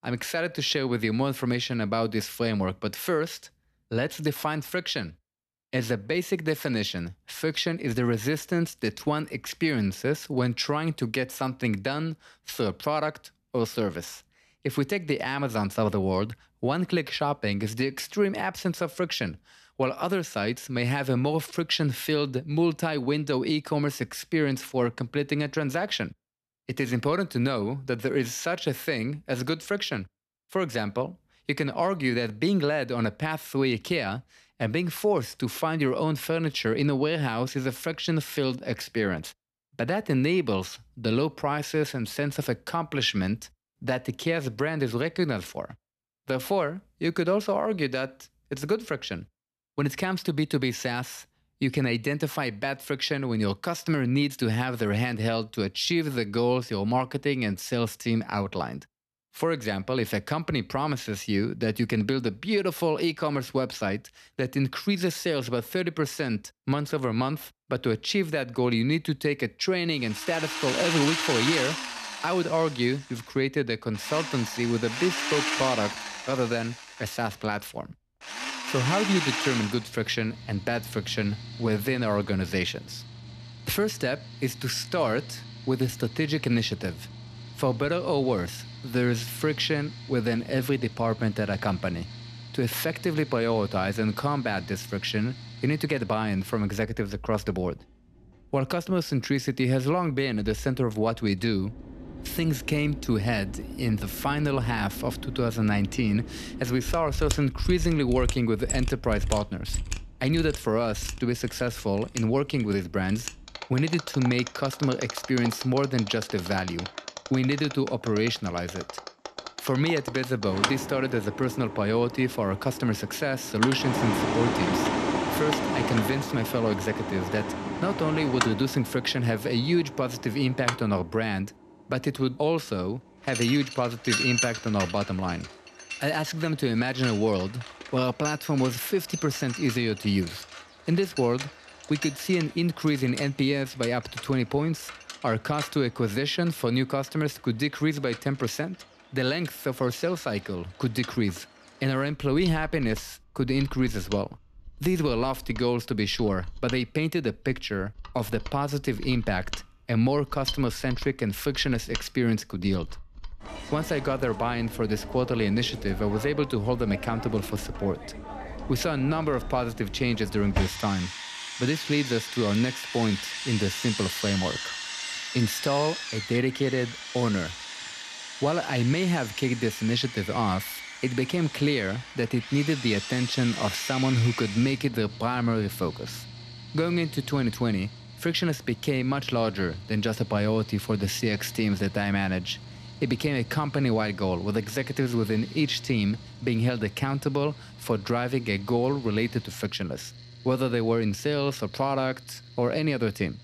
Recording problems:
machinery noise; loud; from 1:10 on; 8 dB below the speech

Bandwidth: 14 kHz